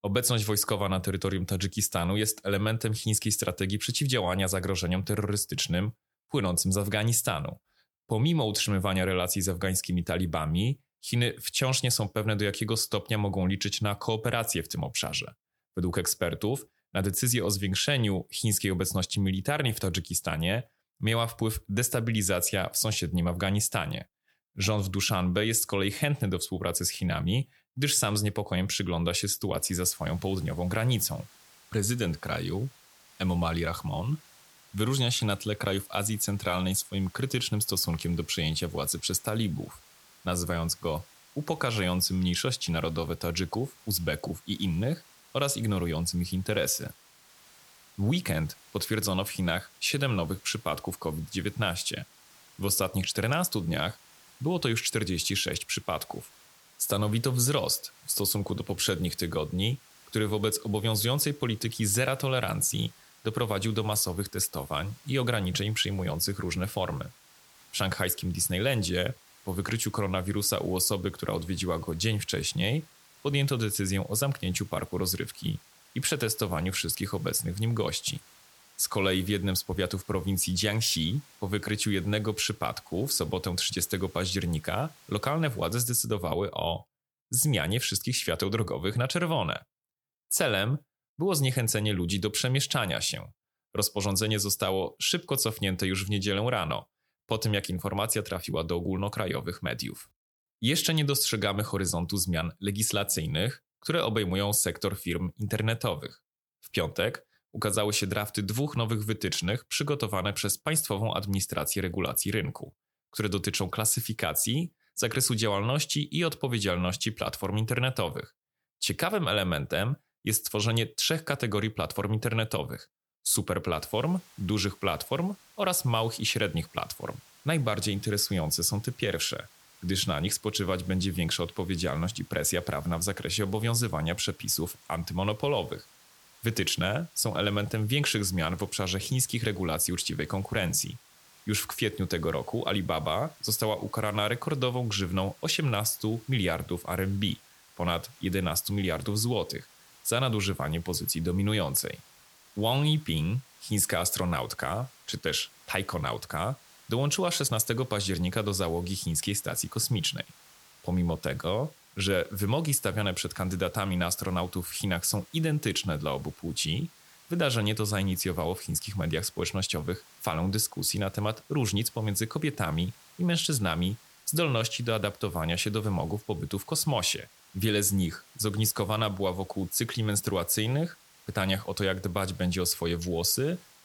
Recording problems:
hiss; faint; from 30 s to 1:26 and from 2:04 on; 25 dB below the speech

